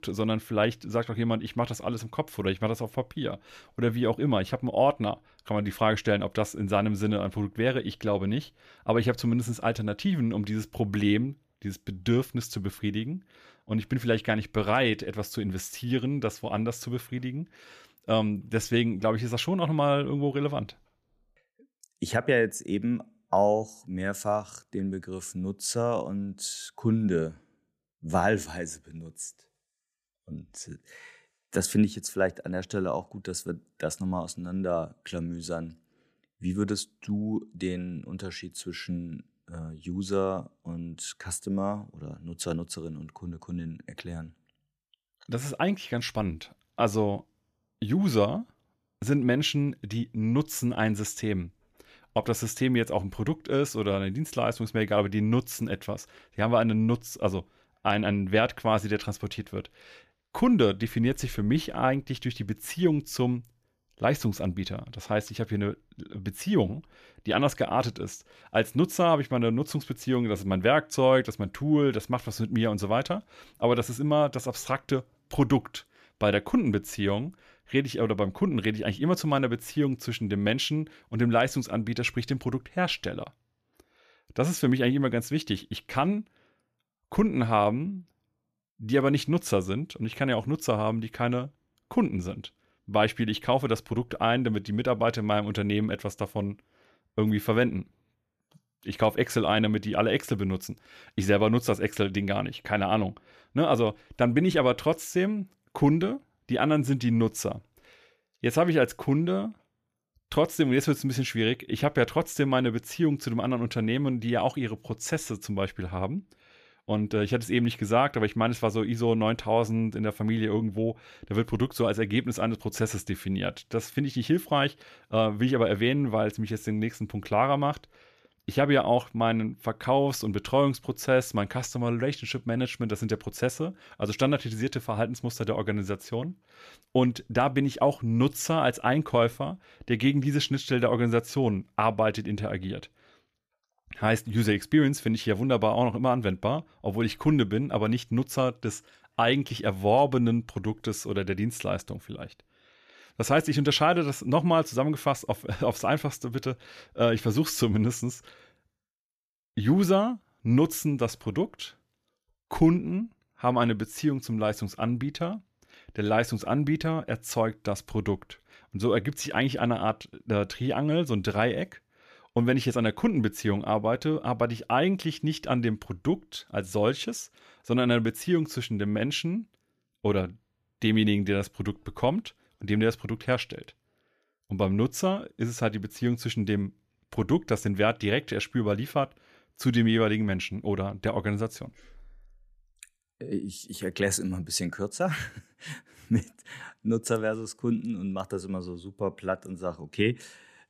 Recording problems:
none

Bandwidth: 14.5 kHz